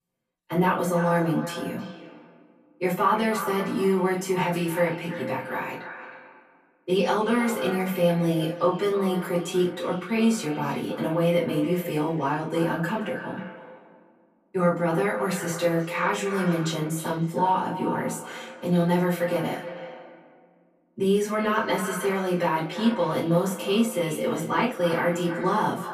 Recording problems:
echo of what is said; strong; throughout; 320 ms later, 10 dB below the speech
off-mic speech; far
room echo; slight; dies away in 0.3 s

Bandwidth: 14.5 kHz